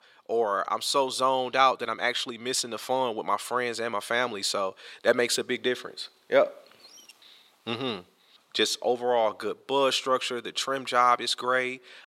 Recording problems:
thin; somewhat; fading below 400 Hz

